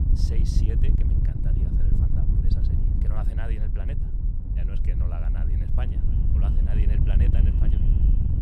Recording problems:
echo of what is said; noticeable; from 5.5 s on; 300 ms later, 20 dB below the speech
wind noise on the microphone; heavy; 3 dB above the speech

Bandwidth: 14.5 kHz